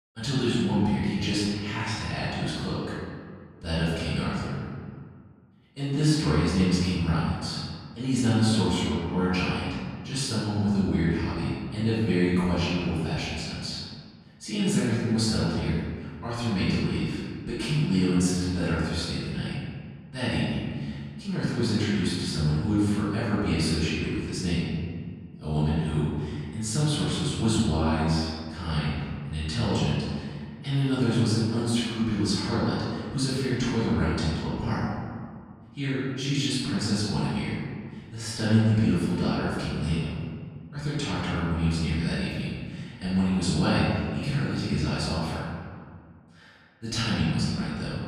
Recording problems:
room echo; strong; dies away in 1.8 s
off-mic speech; far

